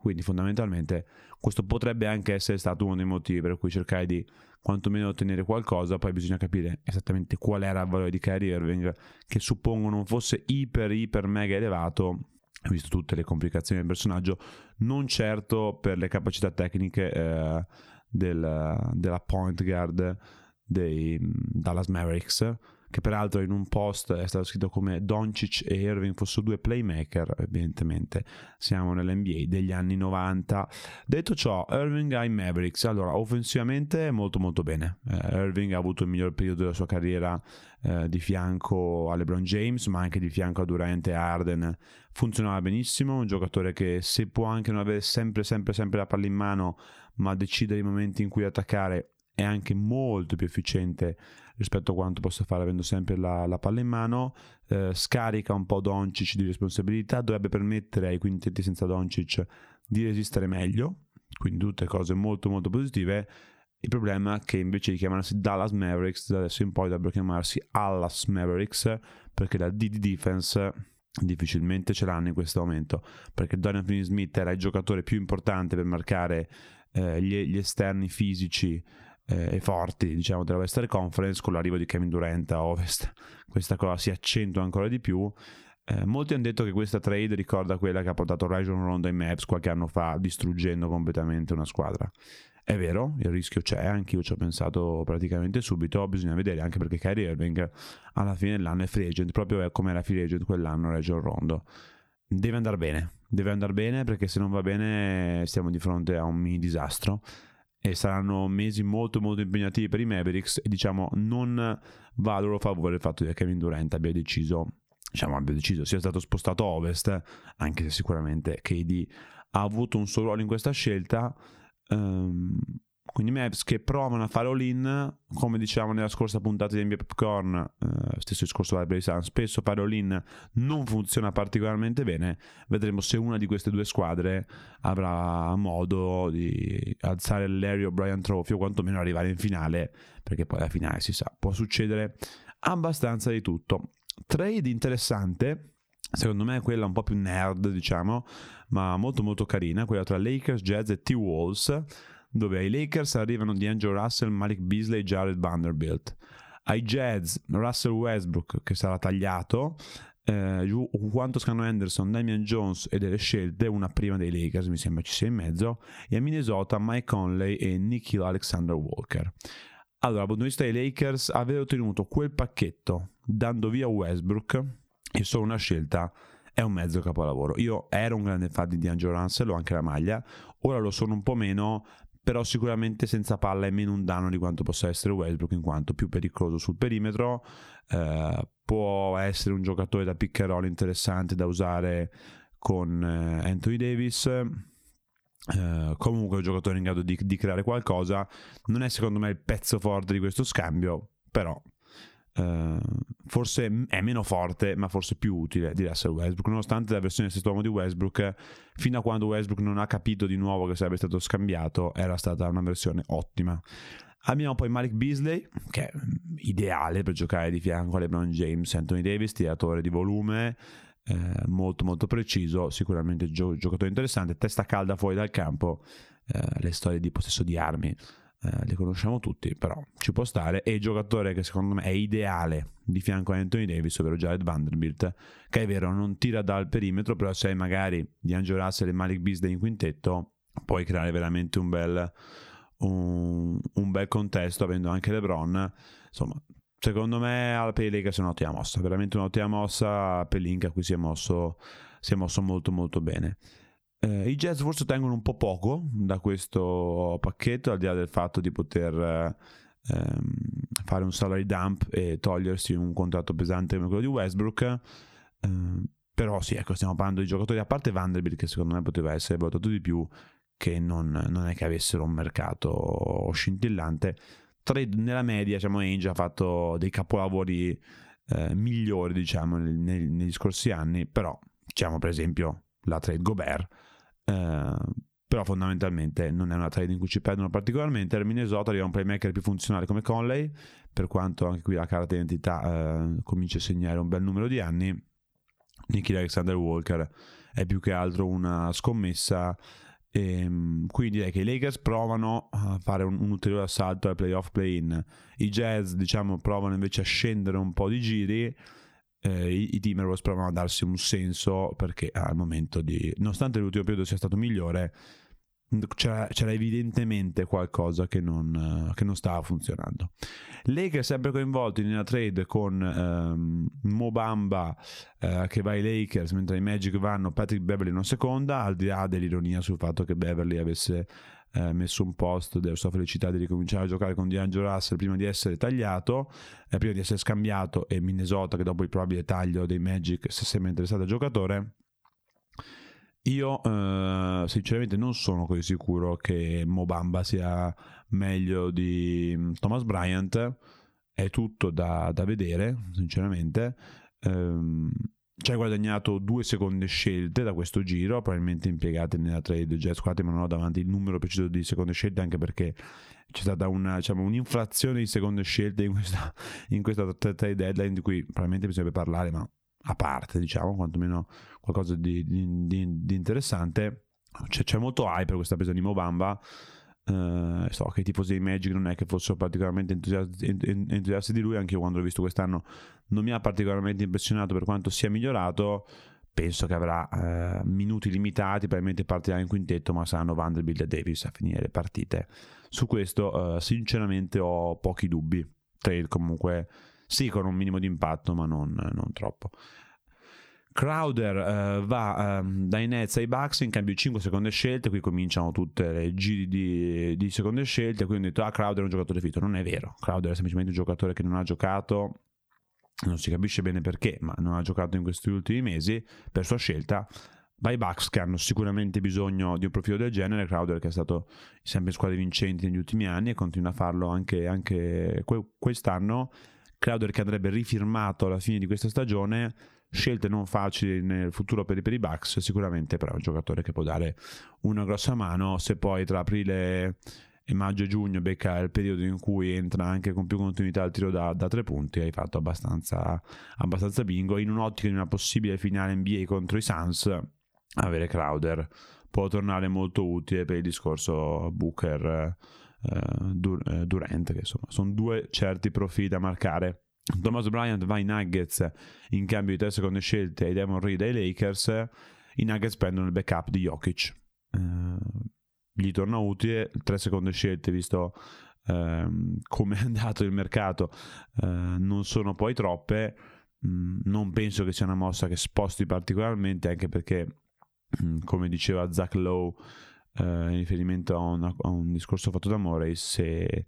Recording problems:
squashed, flat; somewhat

